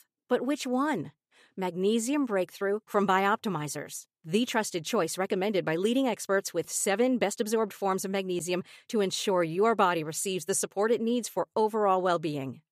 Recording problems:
none

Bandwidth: 14.5 kHz